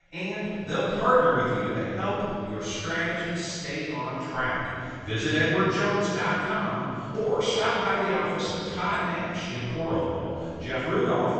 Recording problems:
room echo; strong; dies away in 2.9 s
off-mic speech; far
high frequencies cut off; noticeable; nothing above 8 kHz
voice in the background; faint; throughout; 25 dB below the speech

